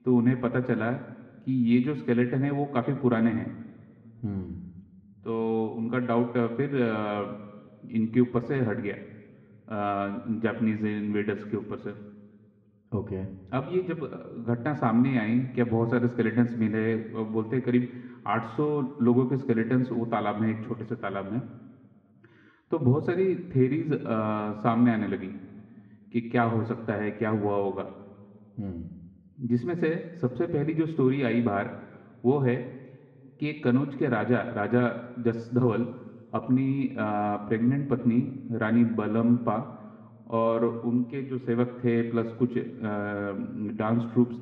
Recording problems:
muffled; very; fading above 1.5 kHz
room echo; slight; dies away in 1.6 s
off-mic speech; somewhat distant

